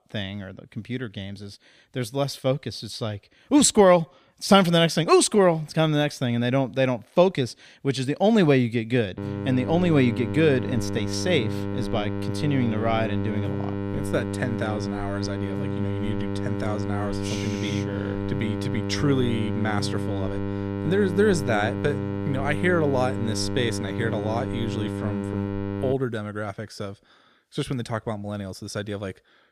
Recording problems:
electrical hum; loud; from 9 to 26 s; 50 Hz, 8 dB below the speech

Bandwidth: 15 kHz